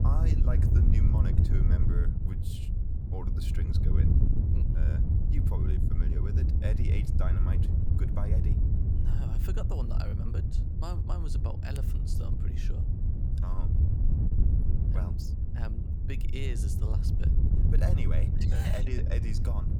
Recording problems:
wind noise on the microphone; heavy; 1 dB above the speech

